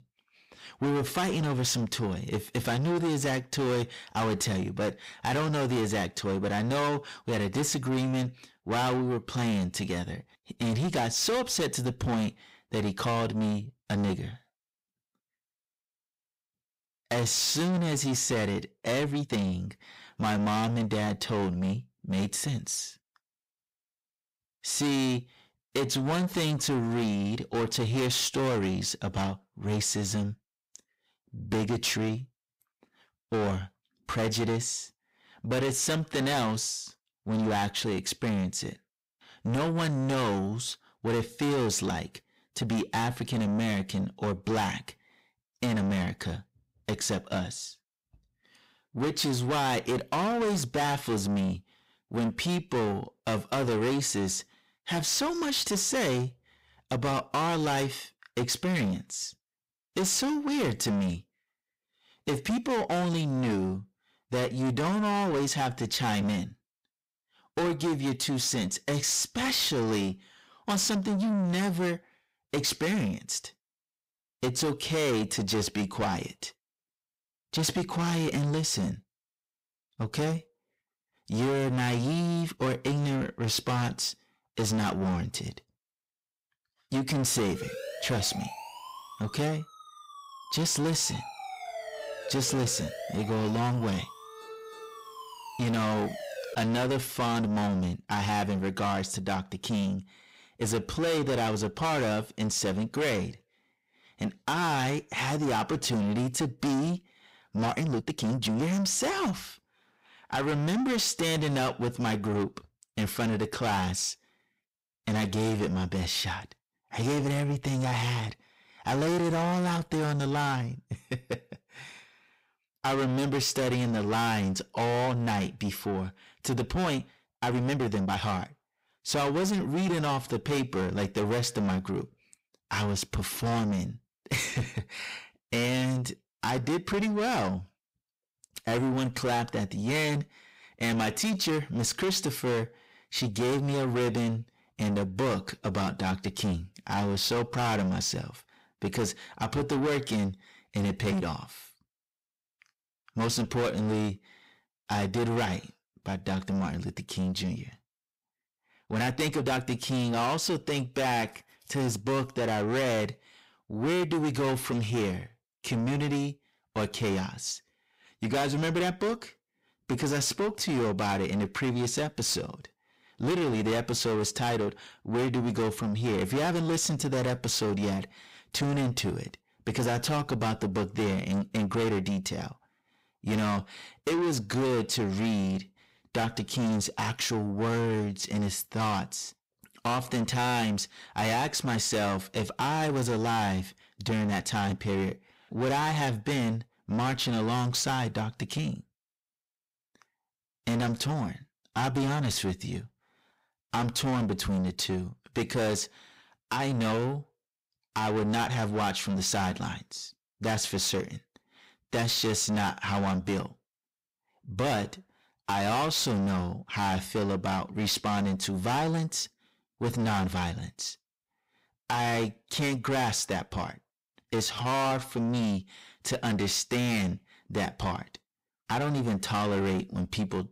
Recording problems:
distortion; heavy; 6 dB below the speech
uneven, jittery; strongly; from 19 s to 3:45
siren; noticeable; from 1:28 to 1:37; peak 9 dB below the speech

